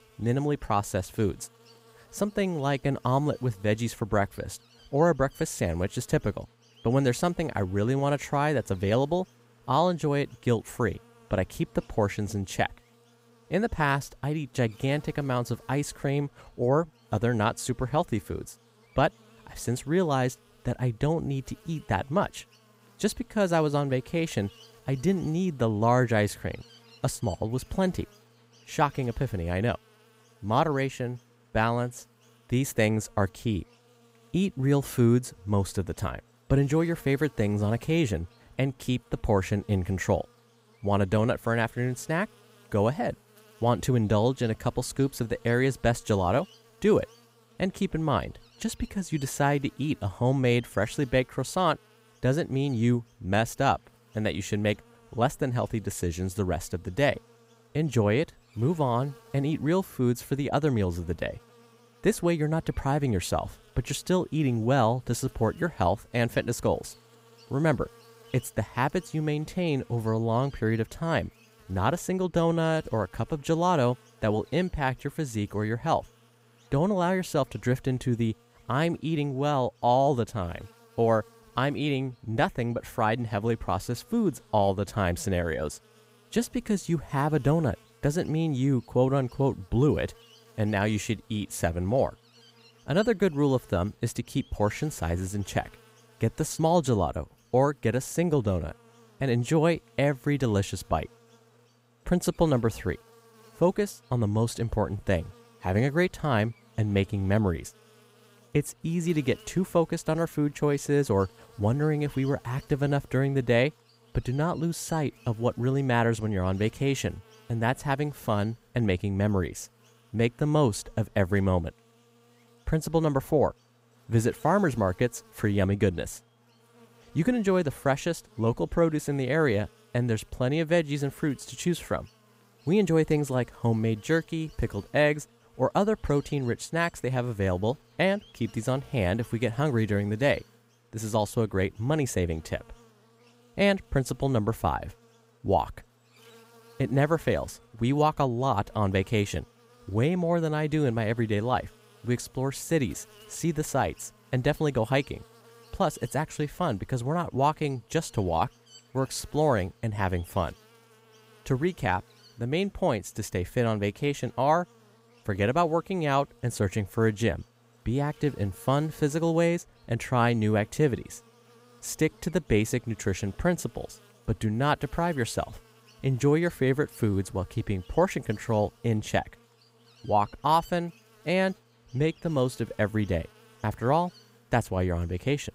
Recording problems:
electrical hum; faint; throughout; 60 Hz, 30 dB below the speech

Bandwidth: 15.5 kHz